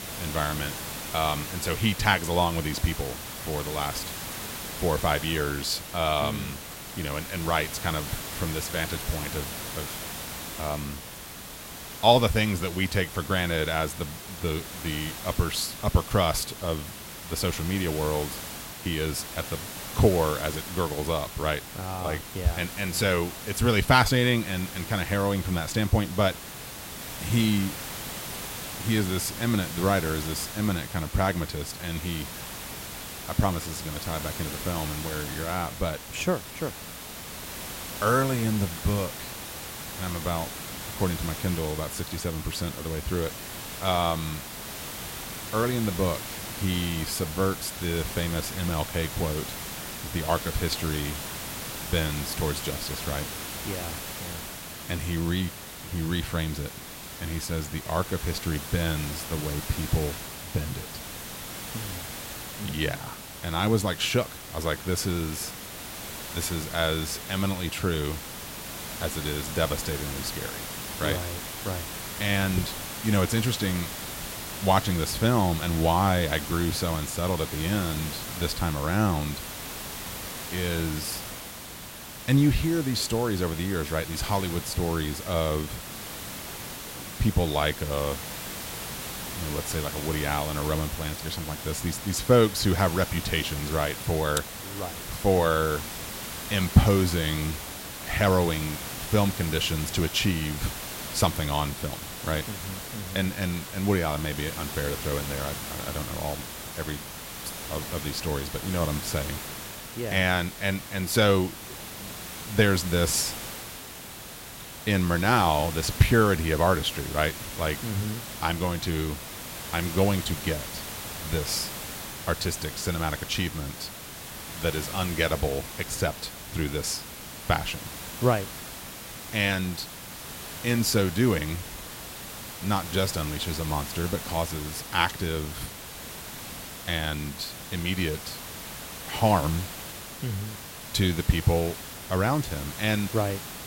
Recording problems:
hiss; loud; throughout; 8 dB below the speech

